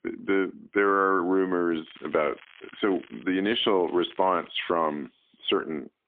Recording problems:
phone-call audio; poor line; nothing above 3.5 kHz
crackling; faint; from 2 to 4.5 s; 25 dB below the speech

